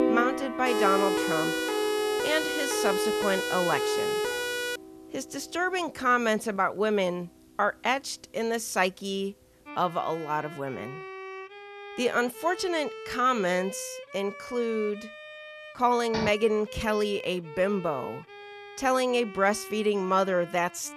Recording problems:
background music; noticeable; throughout; 10 dB below the speech
siren; loud; from 0.5 to 5 s; peak 1 dB above the speech
door banging; noticeable; at 16 s; peak 6 dB below the speech

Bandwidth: 13.5 kHz